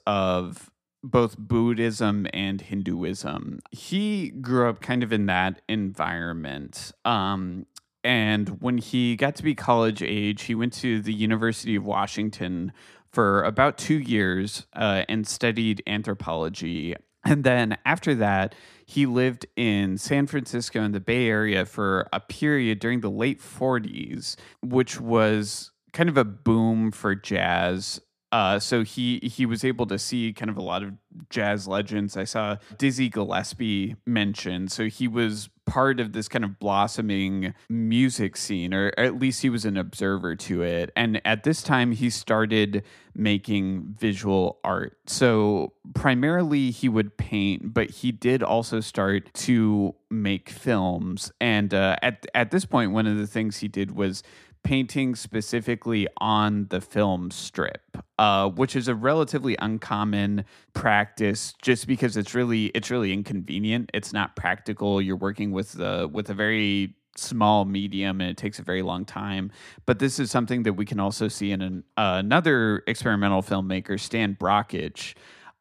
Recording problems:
none

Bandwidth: 14.5 kHz